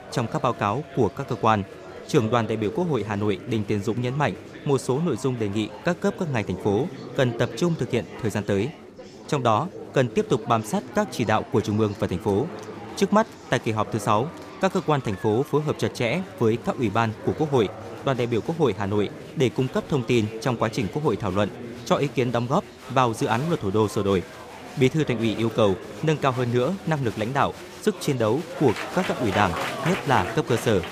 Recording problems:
murmuring crowd; noticeable; throughout; 10 dB below the speech

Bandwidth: 15 kHz